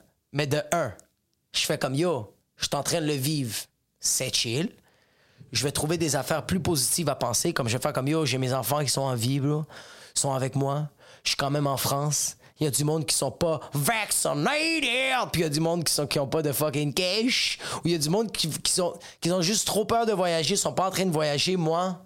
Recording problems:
squashed, flat; heavily

